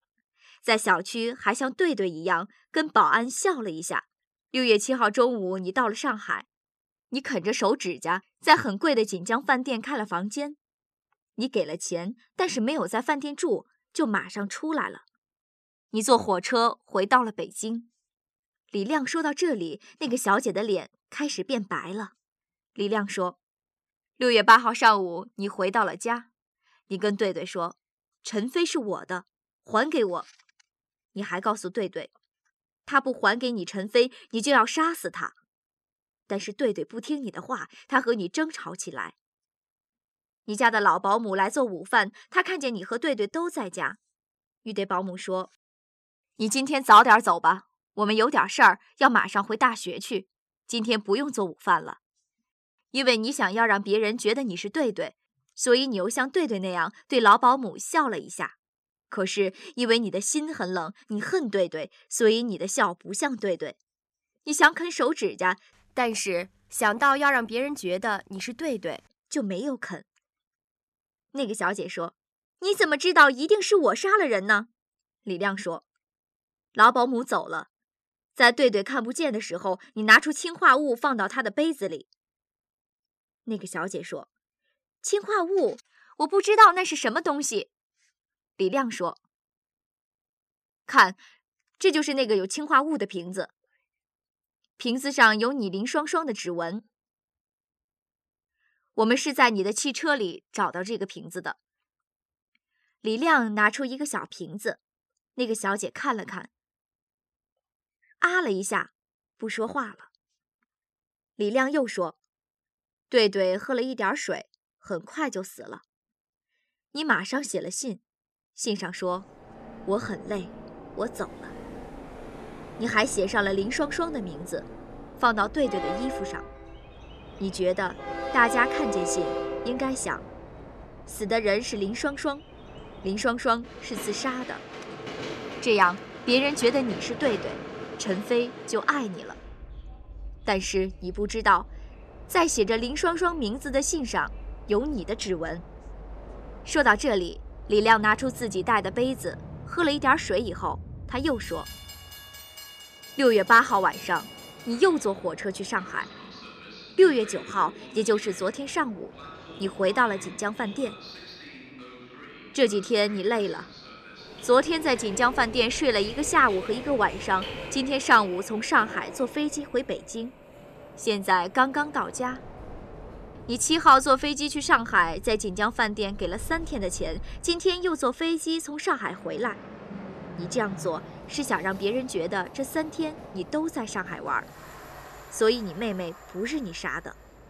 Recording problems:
train or aircraft noise; noticeable; from 1:59 on; 15 dB below the speech

